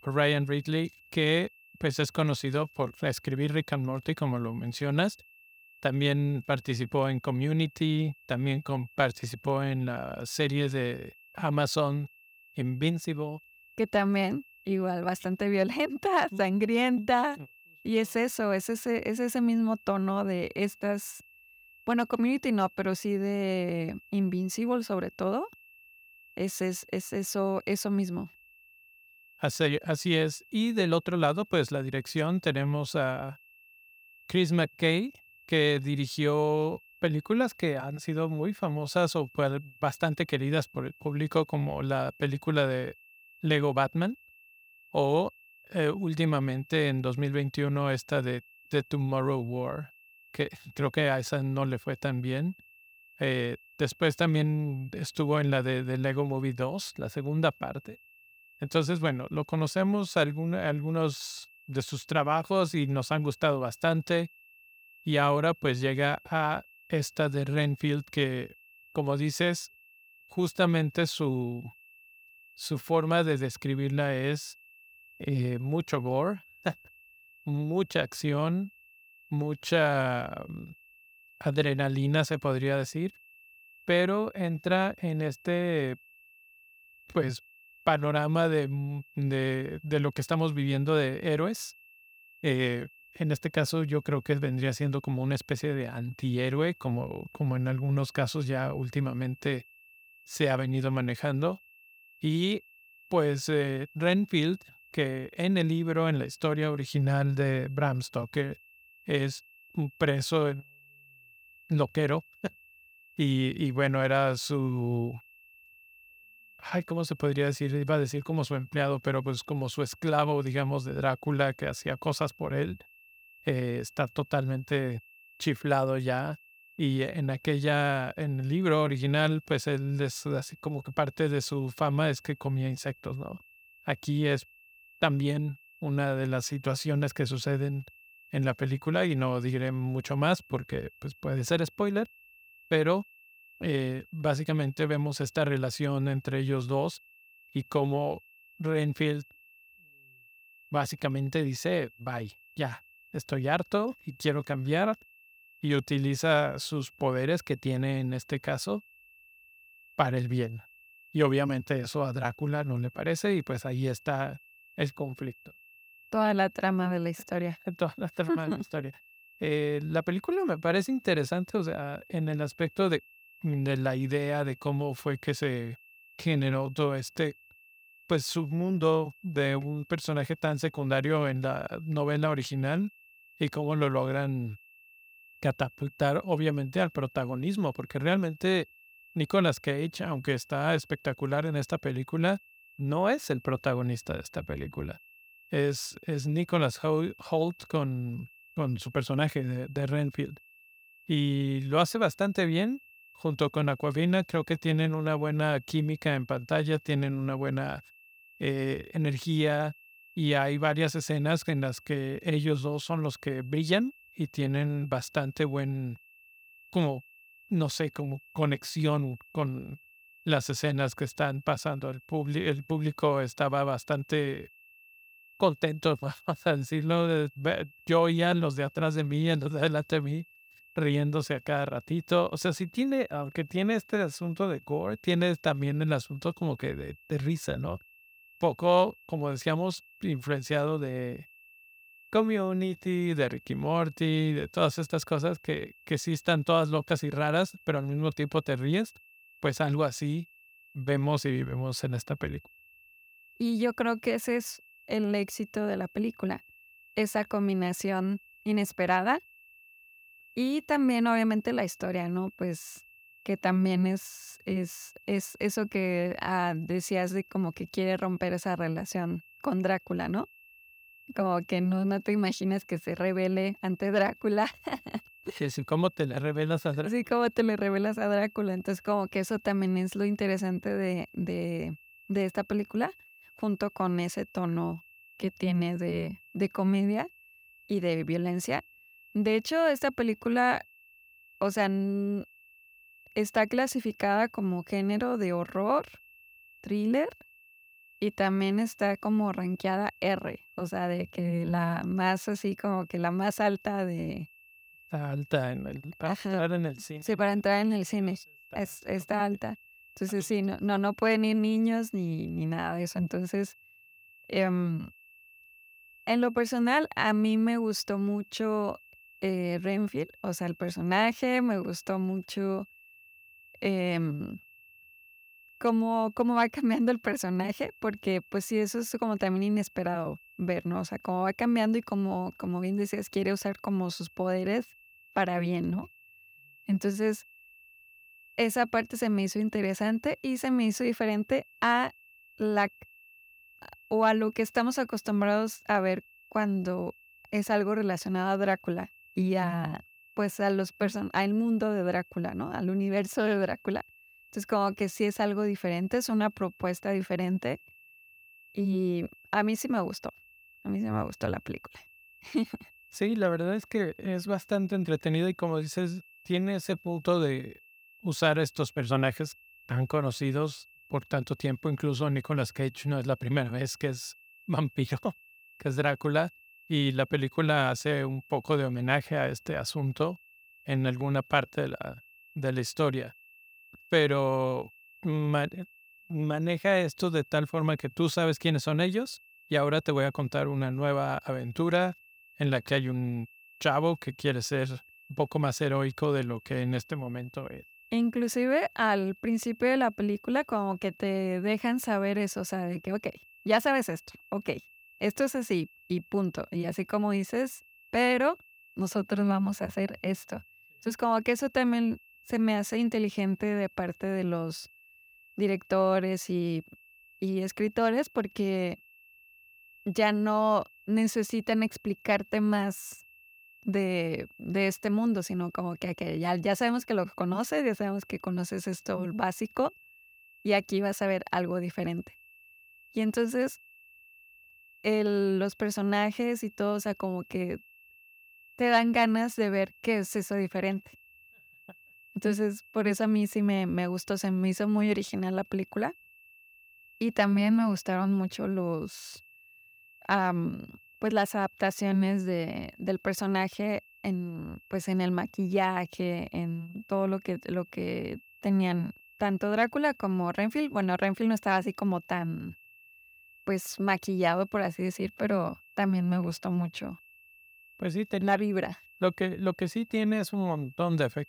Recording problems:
high-pitched whine; faint; throughout; 2.5 kHz, 25 dB below the speech

